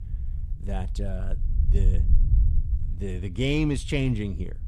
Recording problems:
low rumble; noticeable; throughout; 15 dB below the speech

